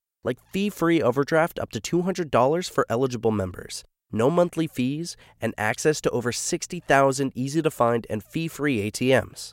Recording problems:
none

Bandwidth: 16 kHz